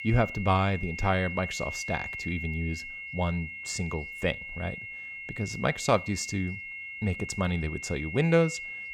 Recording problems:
high-pitched whine; loud; throughout; 2 kHz, 7 dB below the speech

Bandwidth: 17 kHz